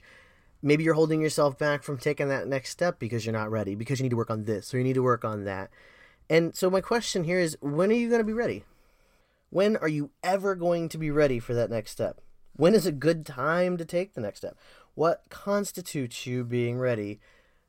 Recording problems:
uneven, jittery; strongly; from 0.5 to 17 s

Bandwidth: 16 kHz